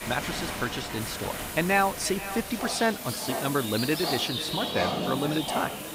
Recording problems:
echo of what is said; noticeable; throughout; 480 ms later, 15 dB below the speech
animal sounds; loud; throughout; 4 dB below the speech
hiss; loud; throughout; 10 dB below the speech

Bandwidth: 15.5 kHz